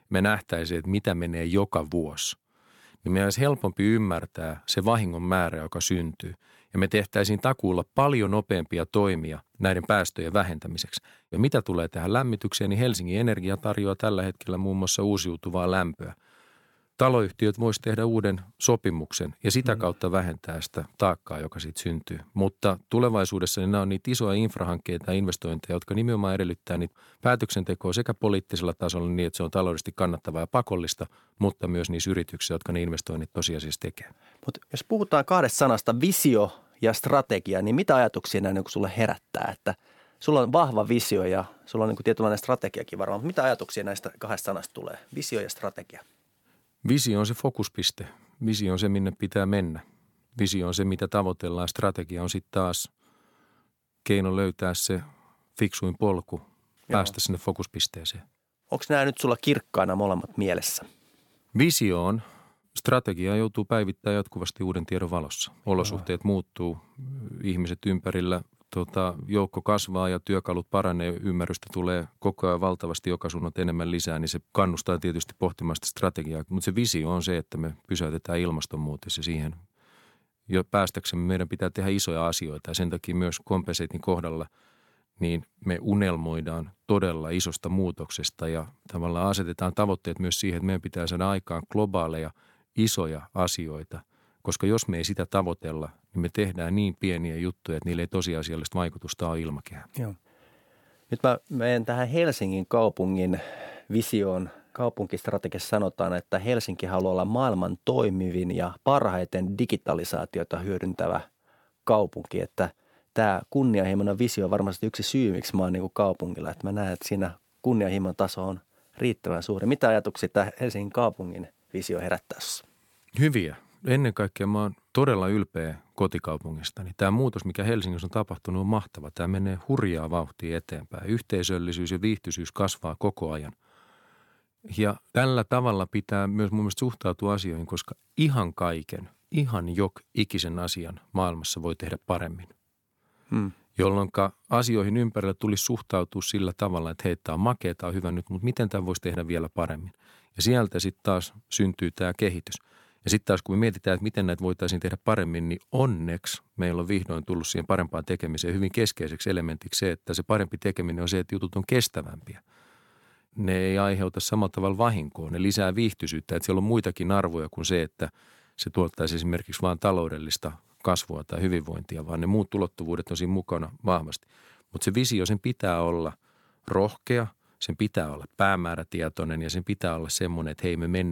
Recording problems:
abrupt cut into speech; at the end

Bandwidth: 18 kHz